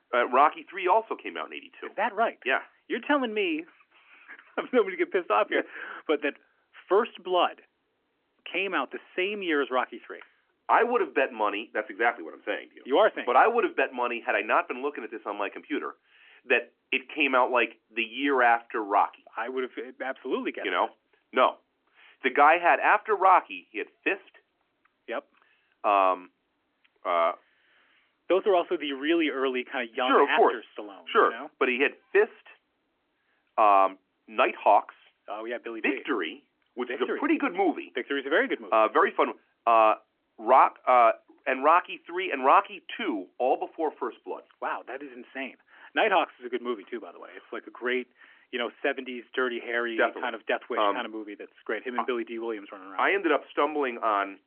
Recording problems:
phone-call audio; nothing above 3 kHz

